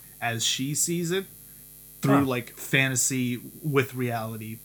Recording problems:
electrical hum; faint; throughout; 60 Hz, 25 dB below the speech

